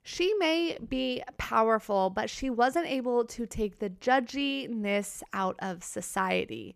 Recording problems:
none

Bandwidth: 14.5 kHz